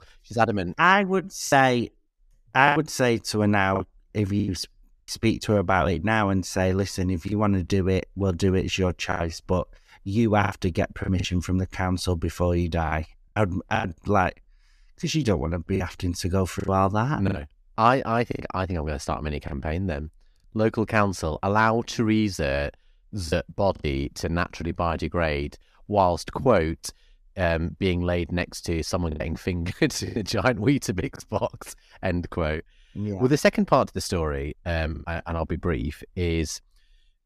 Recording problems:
choppy; occasionally; 5% of the speech affected

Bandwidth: 14.5 kHz